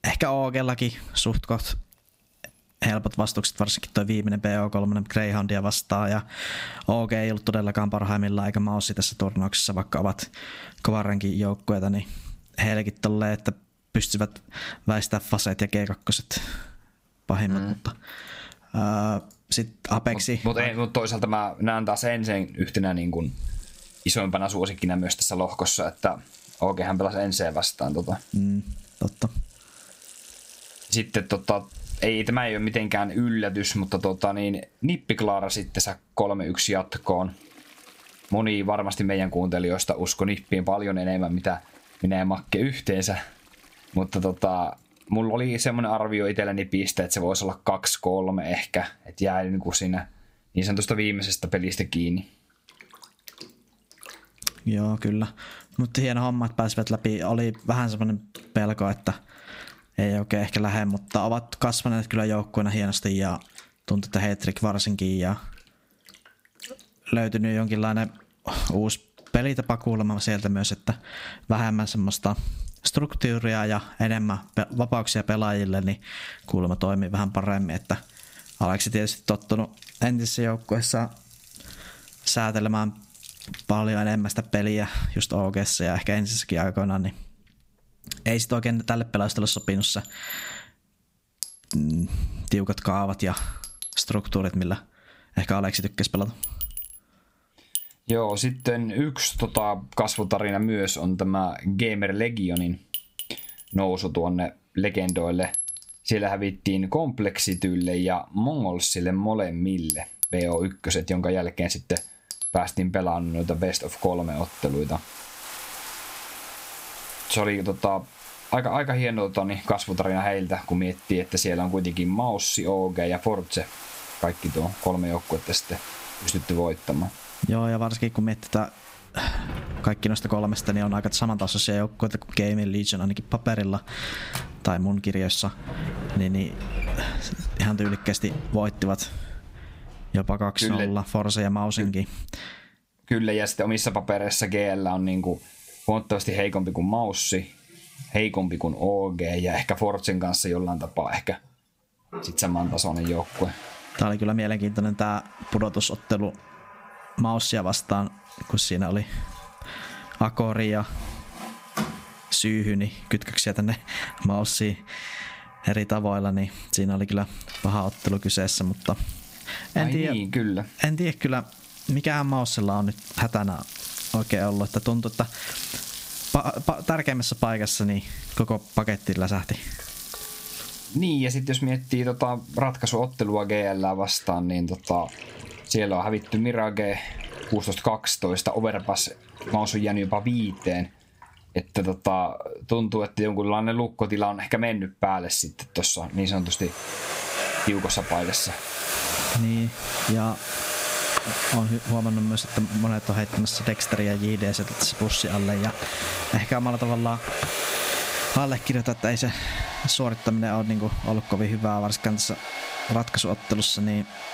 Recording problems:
squashed, flat; somewhat, background pumping
household noises; loud; throughout; 9 dB below the speech

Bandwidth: 15.5 kHz